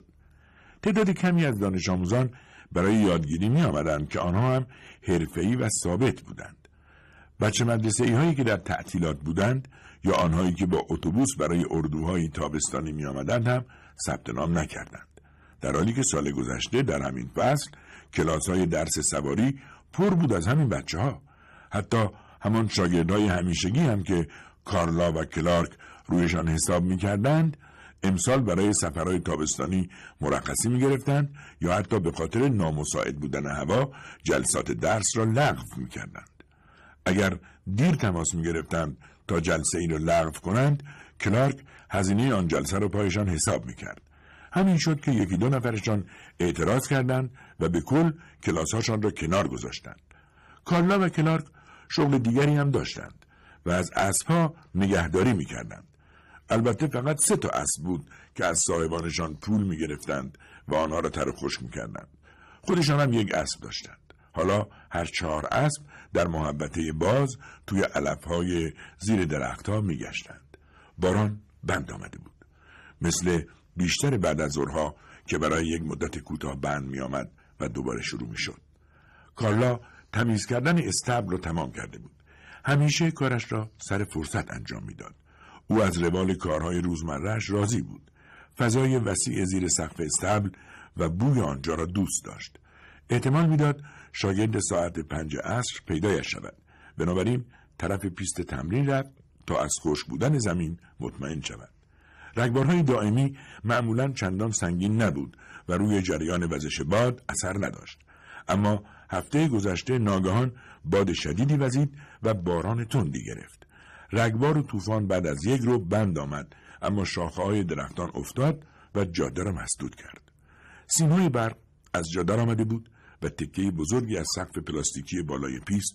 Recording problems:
distortion; slight; 5% of the sound clipped

